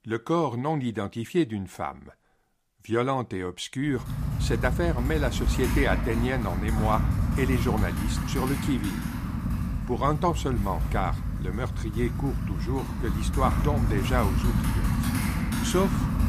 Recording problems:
household noises; very loud; from 4 s on; as loud as the speech

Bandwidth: 15 kHz